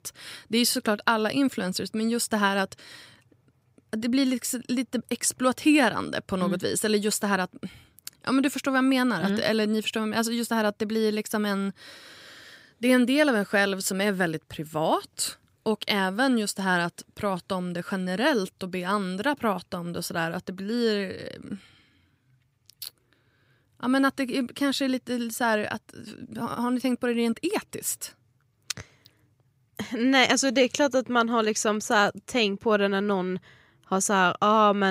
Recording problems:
abrupt cut into speech; at the end

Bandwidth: 15.5 kHz